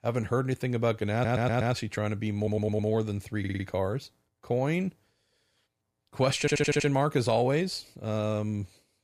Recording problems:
audio stuttering; 4 times, first at 1 s

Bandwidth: 15 kHz